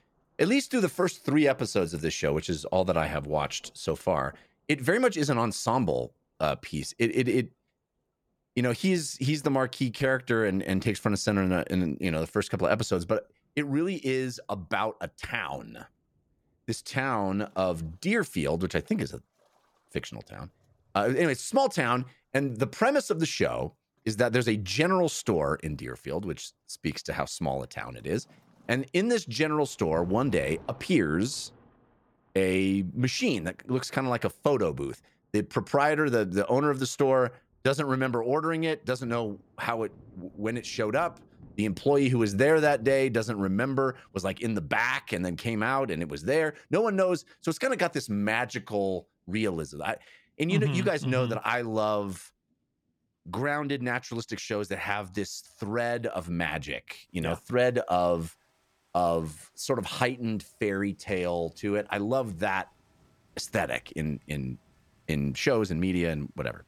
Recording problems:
rain or running water; faint; throughout; 30 dB below the speech

